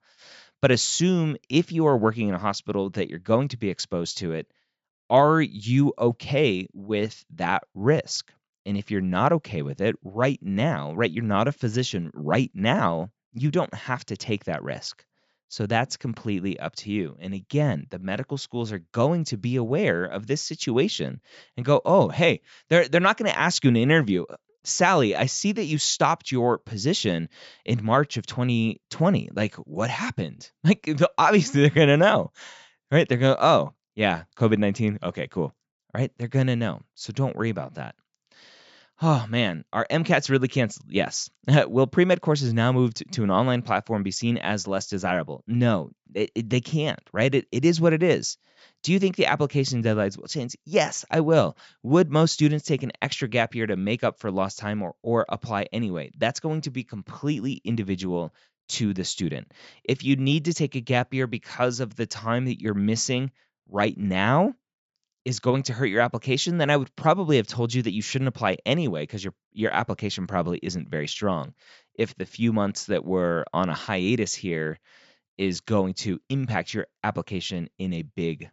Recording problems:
high frequencies cut off; noticeable; nothing above 8 kHz

